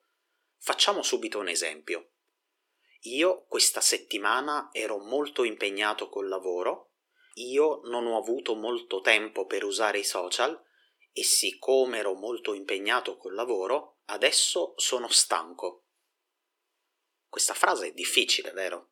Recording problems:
thin; very; fading below 350 Hz

